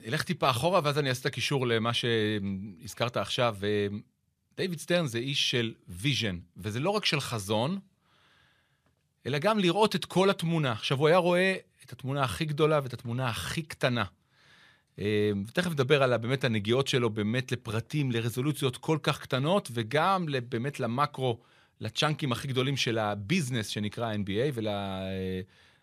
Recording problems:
none

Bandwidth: 14.5 kHz